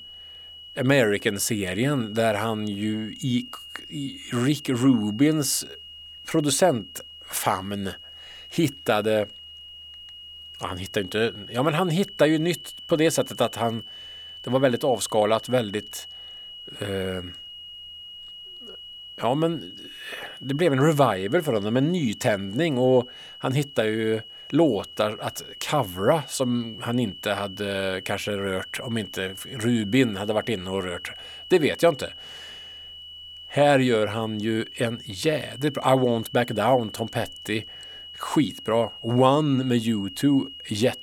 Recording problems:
high-pitched whine; noticeable; throughout; 3 kHz, 15 dB below the speech

